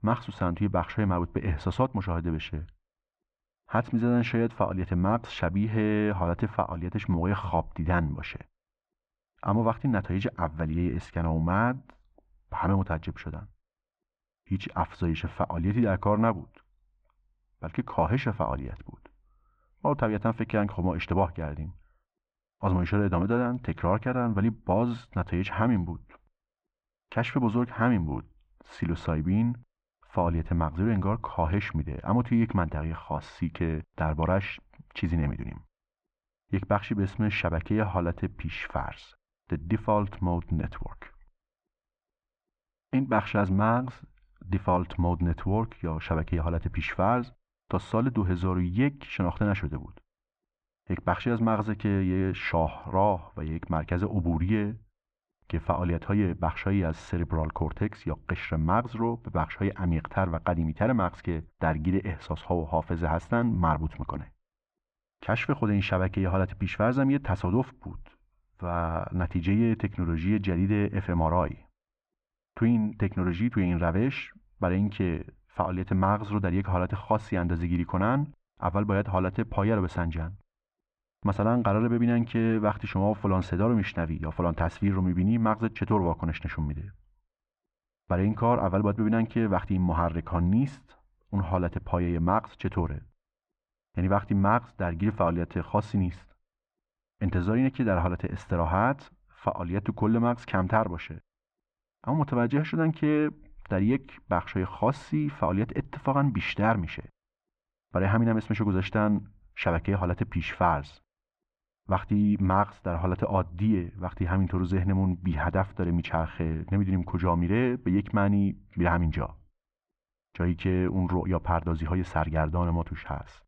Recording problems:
muffled; very; fading above 2.5 kHz

